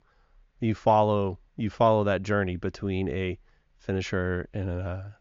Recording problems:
high frequencies cut off; noticeable; nothing above 7 kHz

